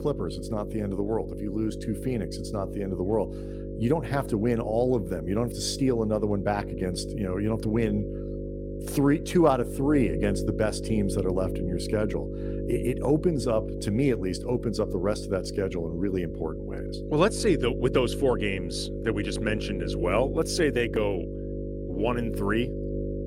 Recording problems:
electrical hum; loud; throughout; 50 Hz, 8 dB below the speech

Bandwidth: 16 kHz